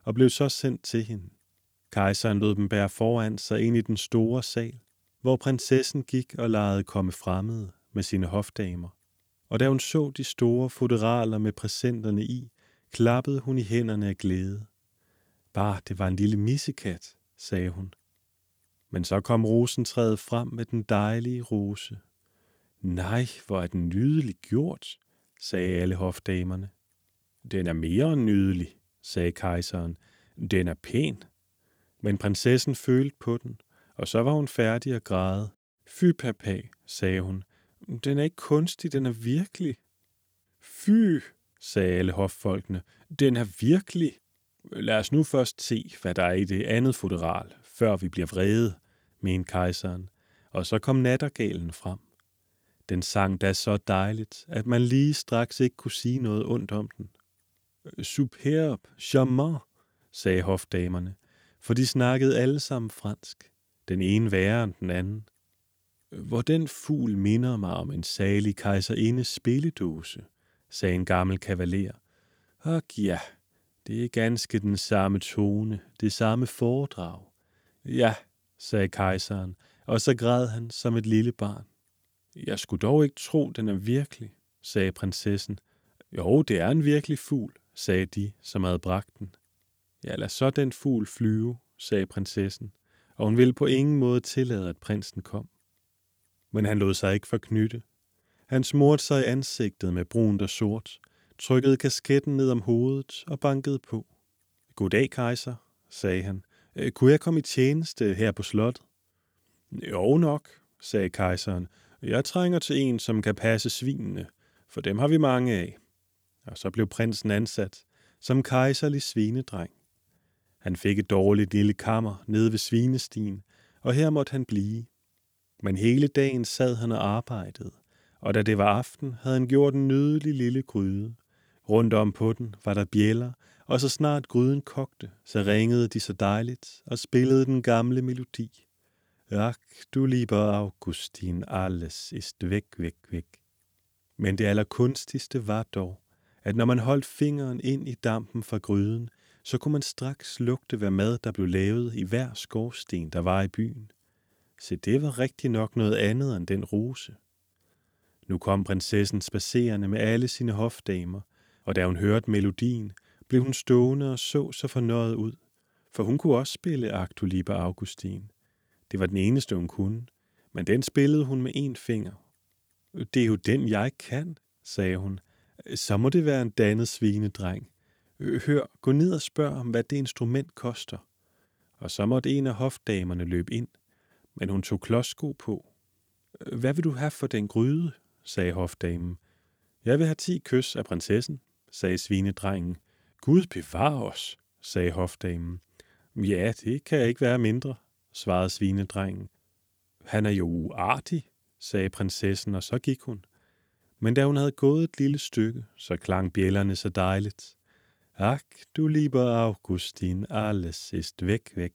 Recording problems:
none

